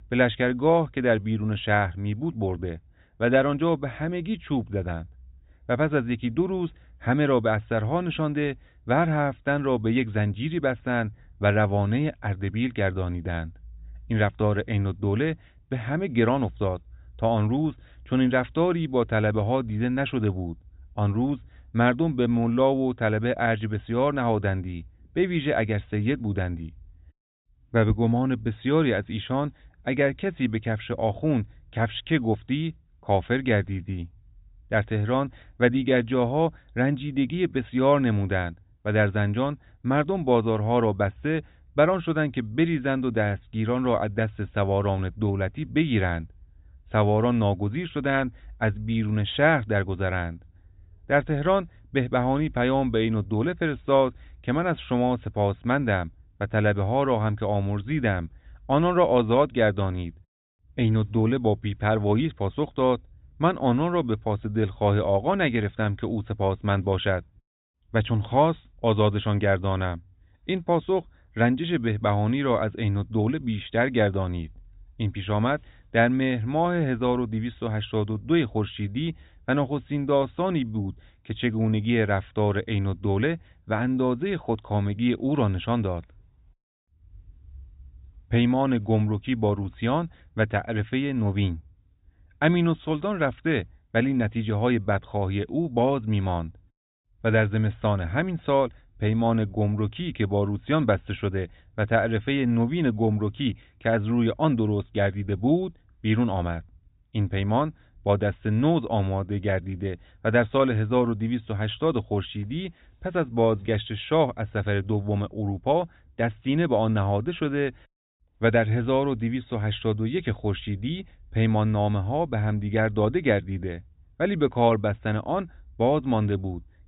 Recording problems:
high frequencies cut off; severe; nothing above 4 kHz

